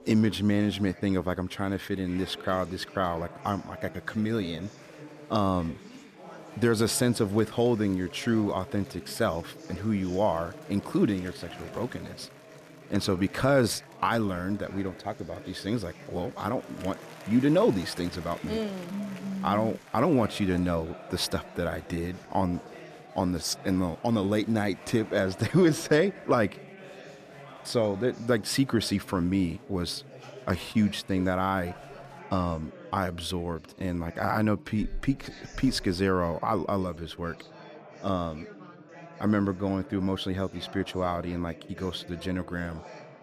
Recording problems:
chatter from many people; noticeable; throughout; 15 dB below the speech

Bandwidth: 14.5 kHz